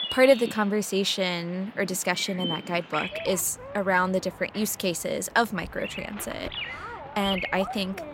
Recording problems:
animal sounds; loud; throughout; 9 dB below the speech

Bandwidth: 16 kHz